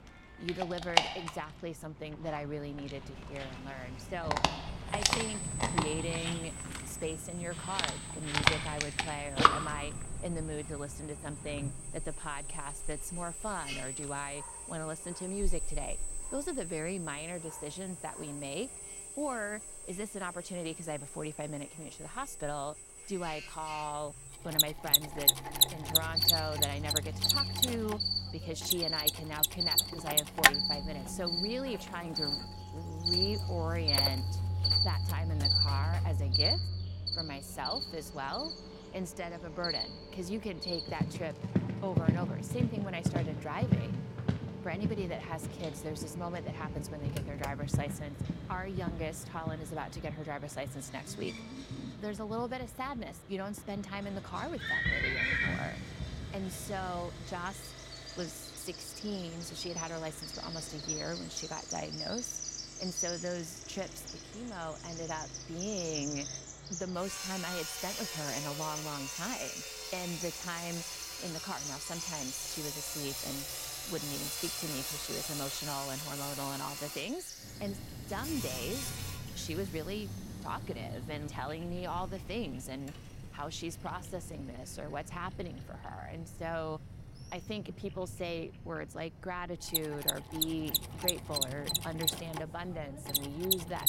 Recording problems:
animal sounds; very loud; throughout; 5 dB above the speech
machinery noise; very loud; throughout; 5 dB above the speech

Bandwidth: 16 kHz